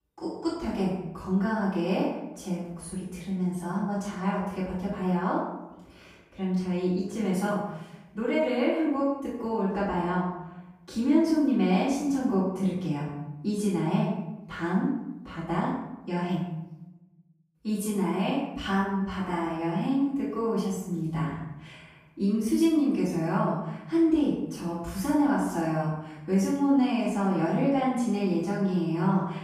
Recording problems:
off-mic speech; far
room echo; noticeable; dies away in 0.8 s

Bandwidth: 15 kHz